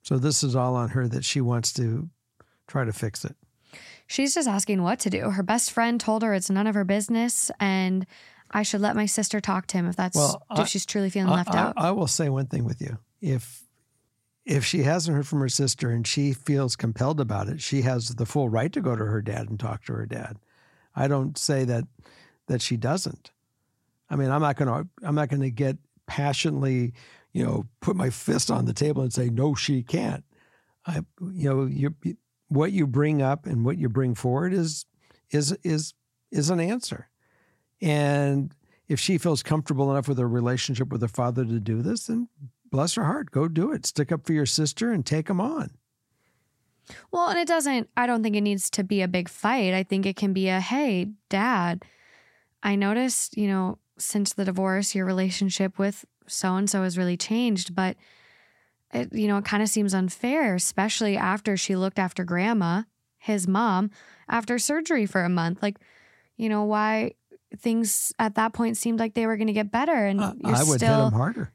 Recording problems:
none

